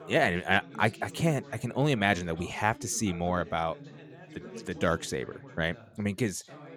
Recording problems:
background chatter; noticeable; throughout; 3 voices, 20 dB below the speech

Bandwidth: 18 kHz